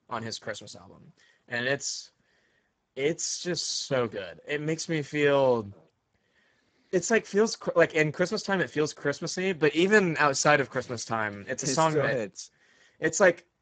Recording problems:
garbled, watery; badly; nothing above 7.5 kHz

